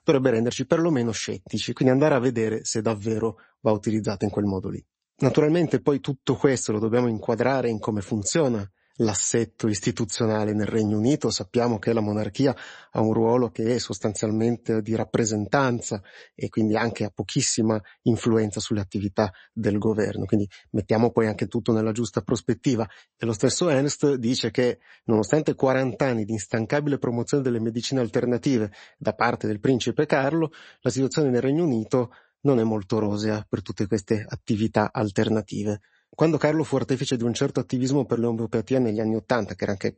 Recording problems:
garbled, watery; slightly; nothing above 8 kHz

